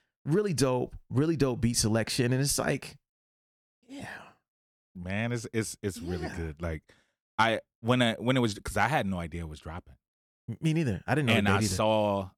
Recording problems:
none

